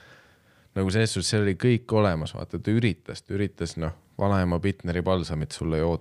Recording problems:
none

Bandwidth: 15 kHz